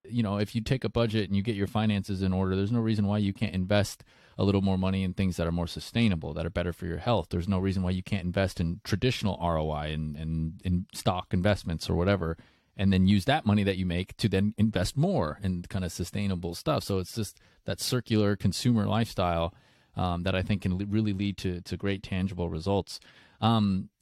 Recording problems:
none

